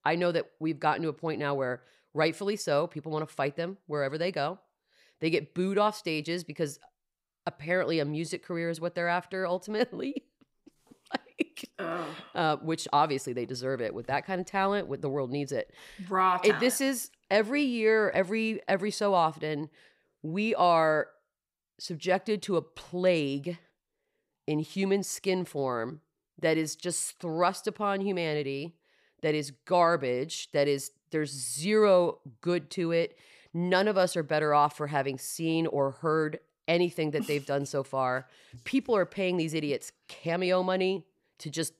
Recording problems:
none

